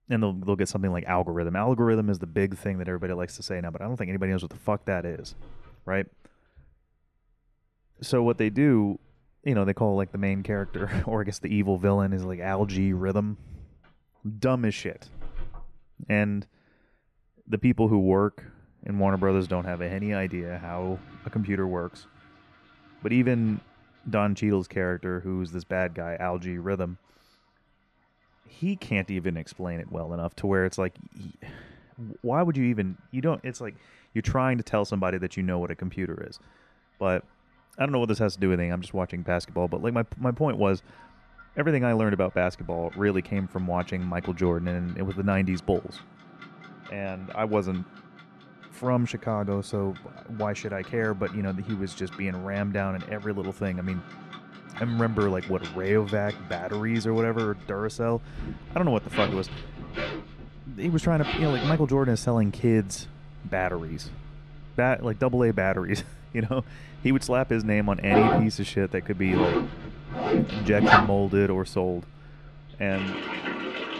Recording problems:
household noises; loud; throughout; 5 dB below the speech

